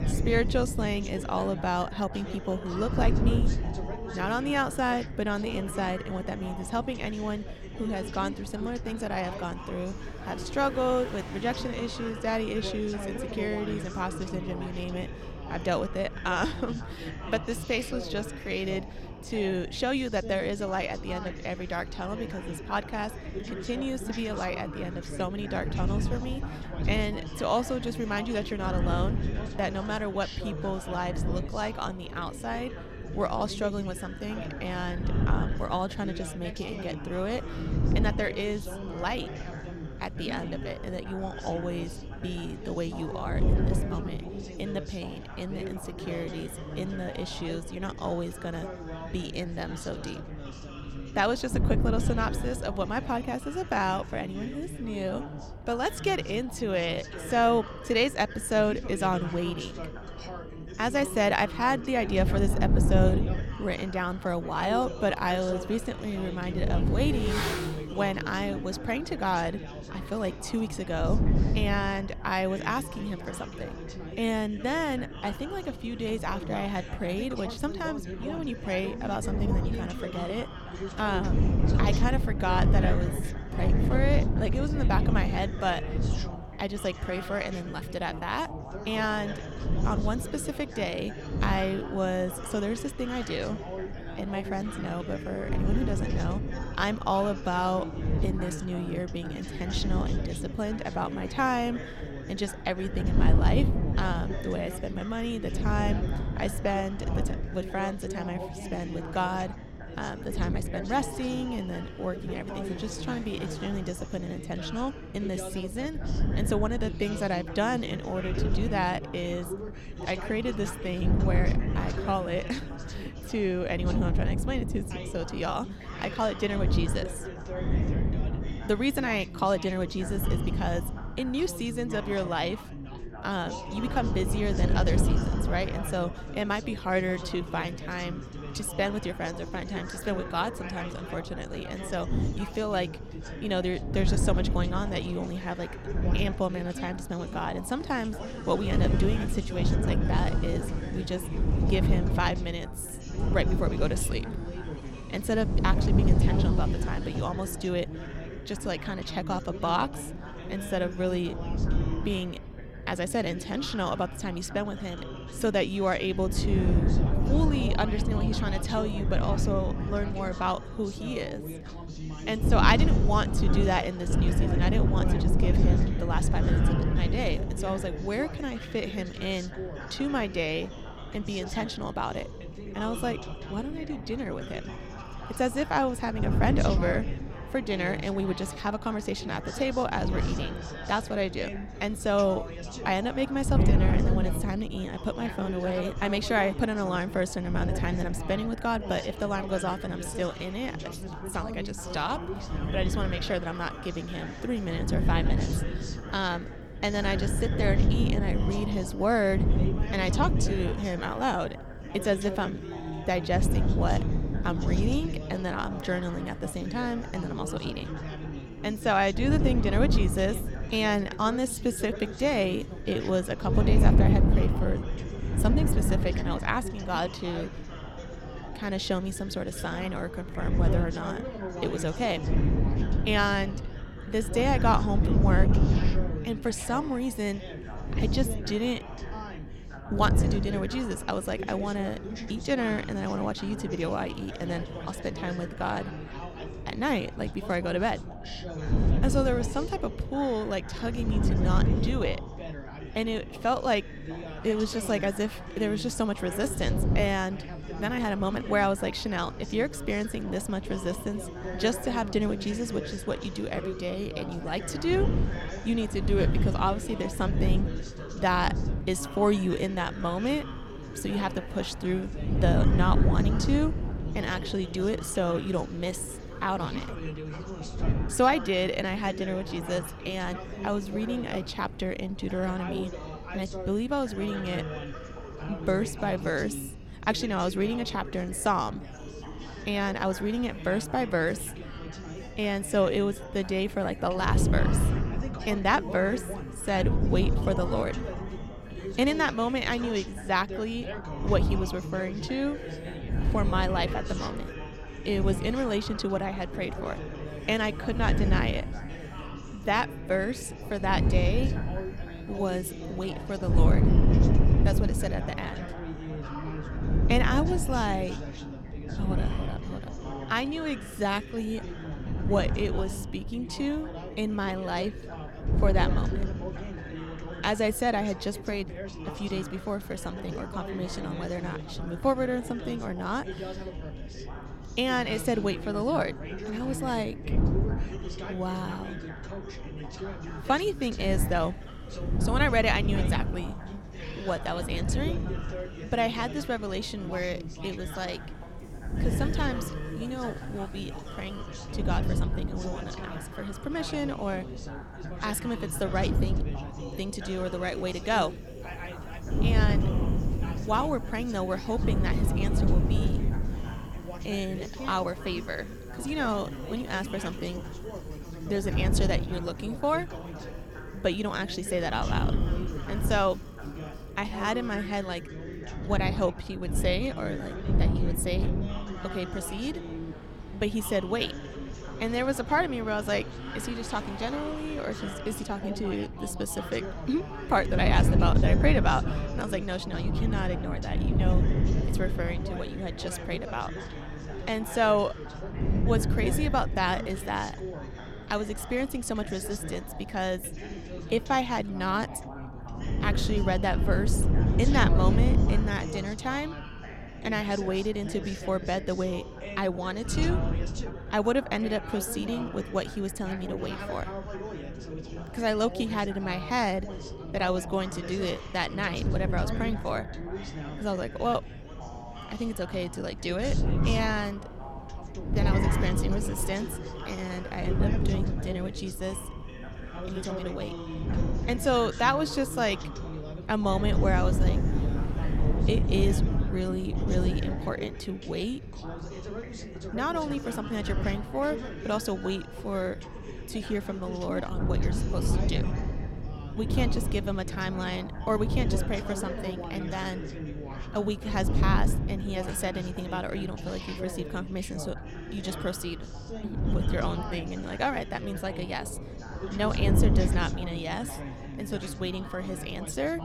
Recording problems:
wind noise on the microphone; heavy; 9 dB below the speech
background chatter; loud; throughout; 3 voices, 9 dB below the speech
traffic noise; faint; throughout; 20 dB below the speech

